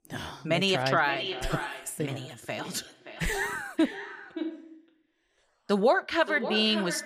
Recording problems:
echo of what is said; strong; throughout; 570 ms later, 10 dB below the speech

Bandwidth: 15 kHz